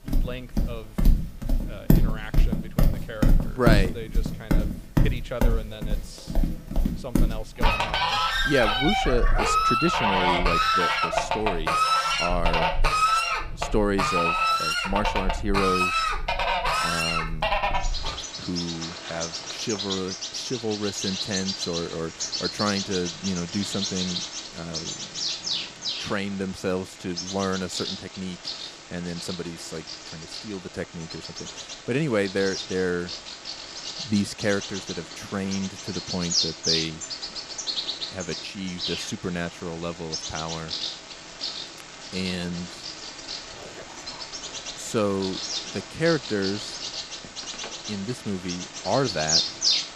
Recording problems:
animal sounds; very loud; throughout; 3 dB above the speech
dog barking; faint; from 43 to 45 s; peak 15 dB below the speech
phone ringing; faint; at 47 s; peak 10 dB below the speech

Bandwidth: 15 kHz